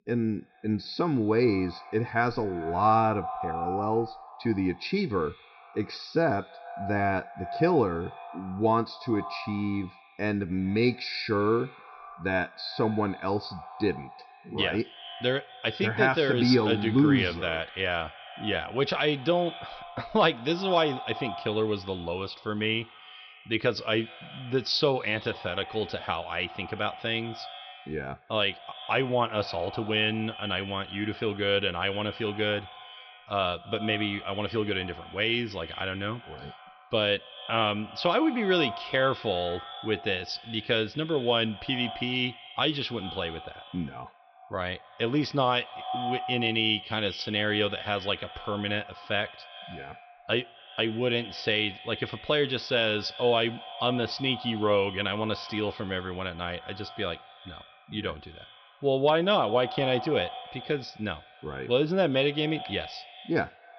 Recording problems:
echo of what is said; noticeable; throughout; 120 ms later, 15 dB below the speech
high frequencies cut off; noticeable; nothing above 5.5 kHz

